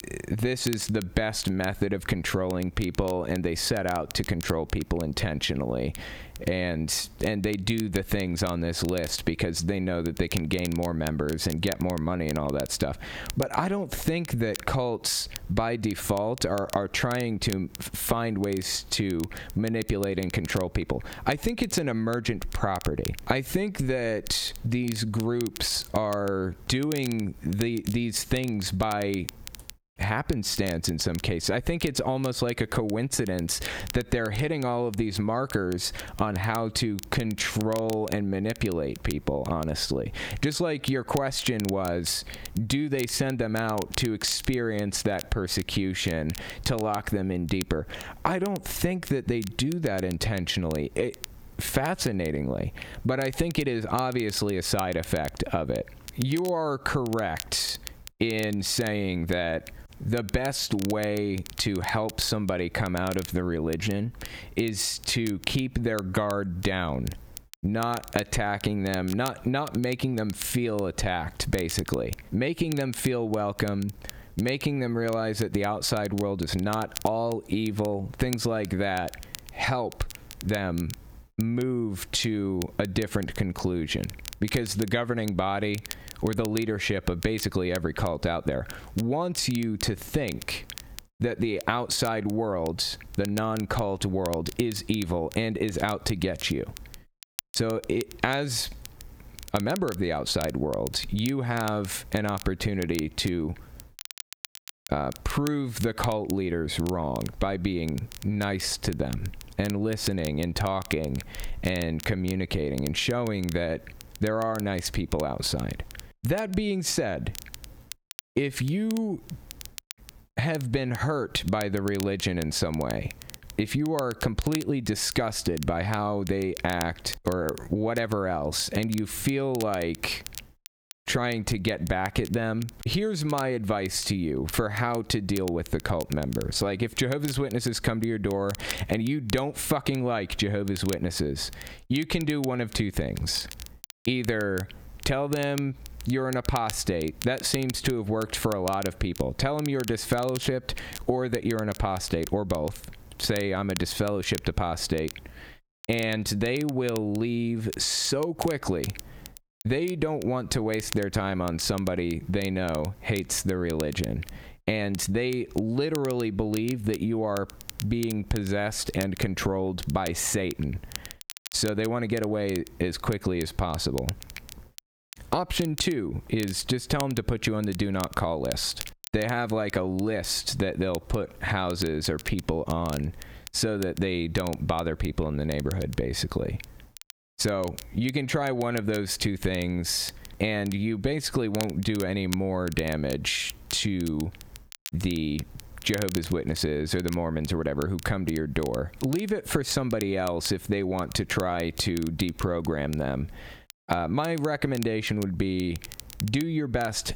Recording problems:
squashed, flat; heavily
crackle, like an old record; noticeable; 15 dB below the speech

